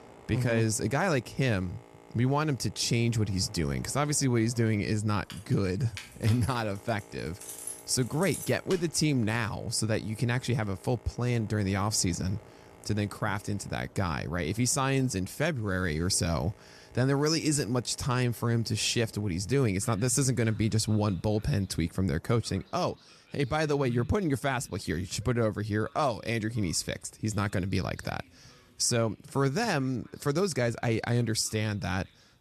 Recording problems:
train or aircraft noise; faint; throughout; 25 dB below the speech
jangling keys; noticeable; from 5.5 to 9 s; peak 9 dB below the speech

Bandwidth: 13.5 kHz